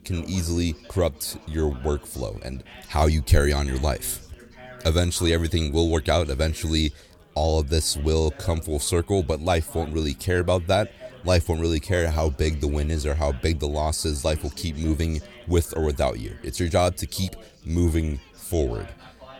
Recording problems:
chatter from many people; faint; throughout; 20 dB below the speech

